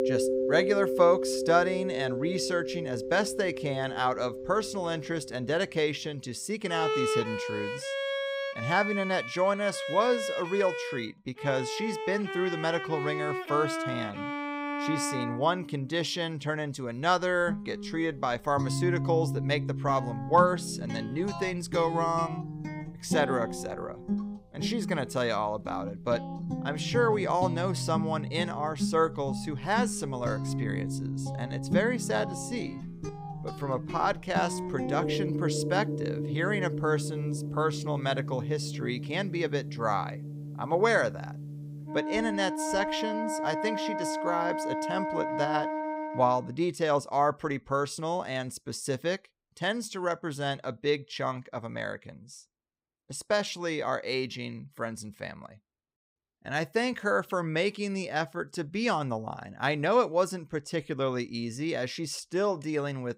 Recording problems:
background music; loud; until 46 s; 4 dB below the speech

